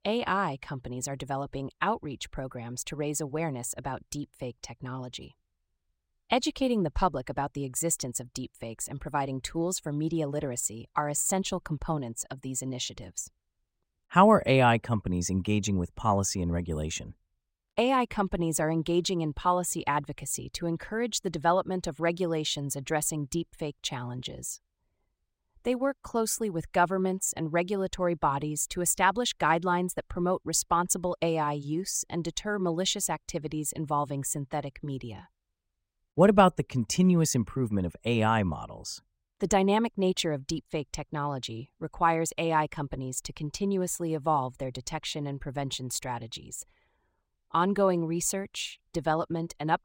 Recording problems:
none

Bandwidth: 16 kHz